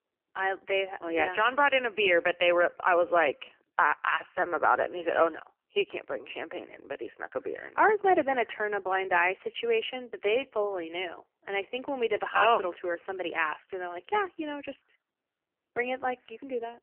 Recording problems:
phone-call audio; poor line; nothing above 3 kHz

